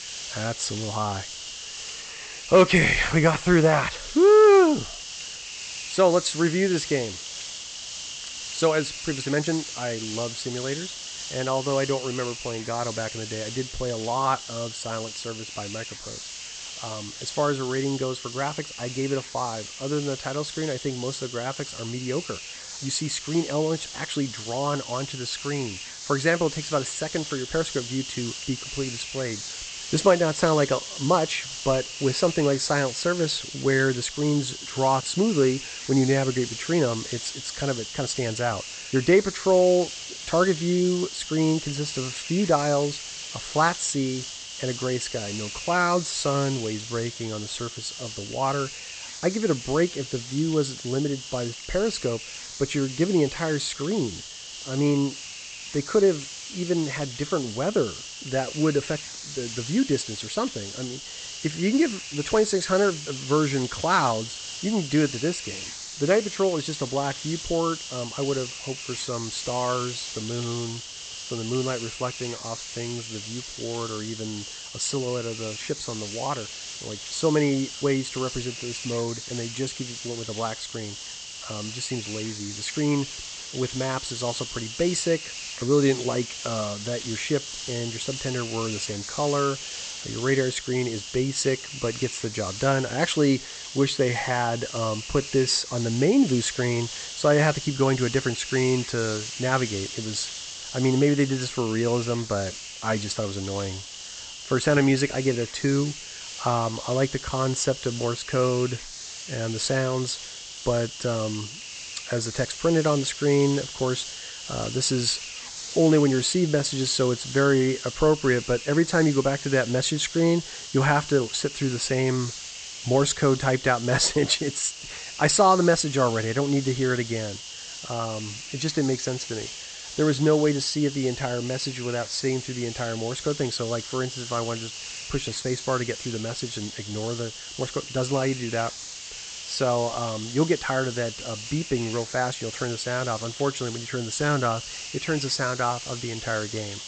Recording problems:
high frequencies cut off; noticeable; nothing above 8 kHz
hiss; loud; throughout; 9 dB below the speech

